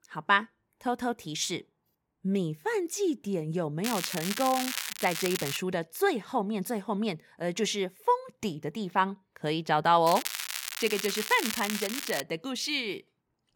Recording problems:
crackling; loud; from 4 to 5.5 s and from 10 to 12 s; 4 dB below the speech

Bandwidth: 17 kHz